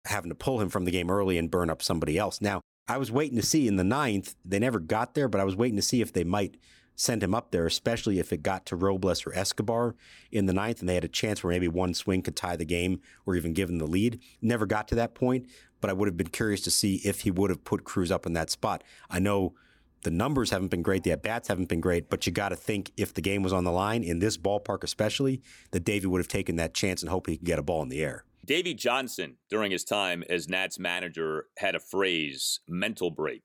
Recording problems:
none

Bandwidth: 18.5 kHz